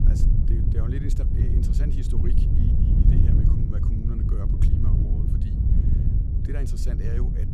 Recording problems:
wind noise on the microphone; heavy; 5 dB above the speech

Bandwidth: 15 kHz